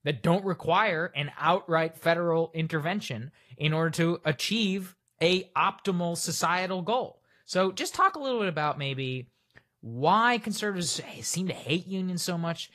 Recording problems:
garbled, watery; slightly; nothing above 15.5 kHz

